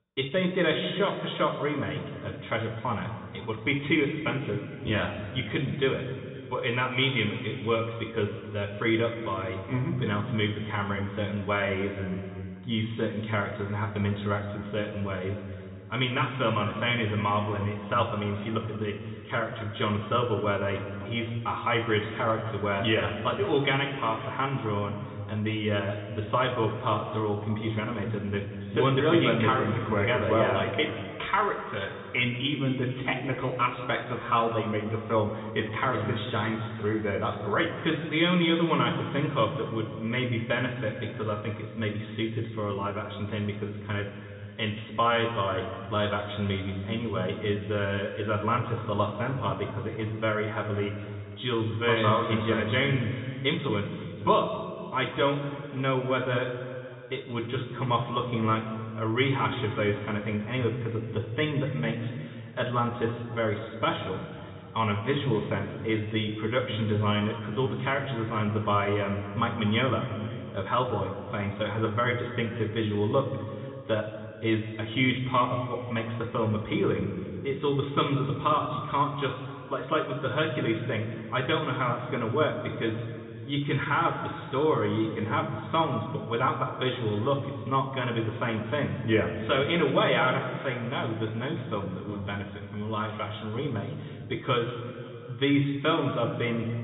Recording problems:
off-mic speech; far
high frequencies cut off; severe; nothing above 4 kHz
room echo; noticeable; dies away in 2.1 s

